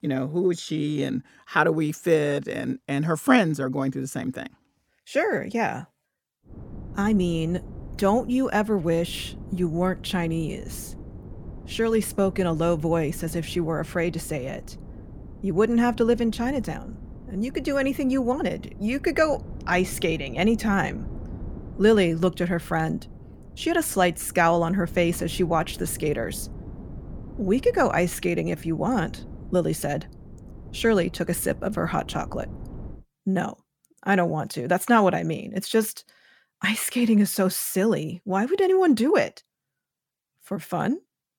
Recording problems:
wind noise on the microphone; occasional gusts; from 6.5 to 33 s; 25 dB below the speech

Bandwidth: 18.5 kHz